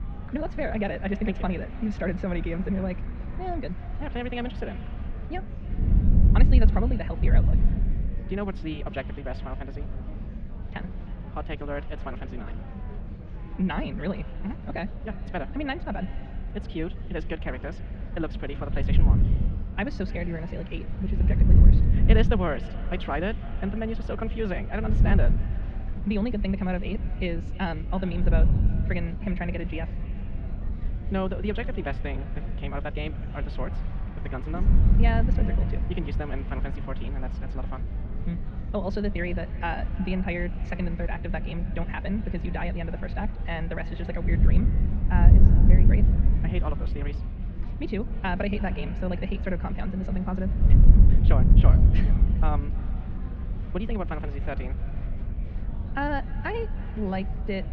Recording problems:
wrong speed, natural pitch; too fast; 1.6 times normal speed
muffled; slightly; fading above 3.5 kHz
echo of what is said; faint; throughout; 310 ms later, 20 dB below the speech
wind noise on the microphone; heavy; 8 dB below the speech
murmuring crowd; noticeable; throughout; 15 dB below the speech

